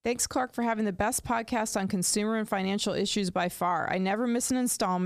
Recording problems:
abrupt cut into speech; at the end

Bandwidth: 14.5 kHz